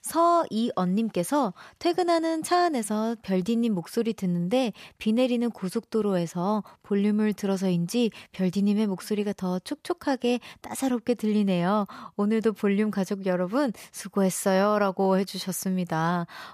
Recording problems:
none

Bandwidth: 14.5 kHz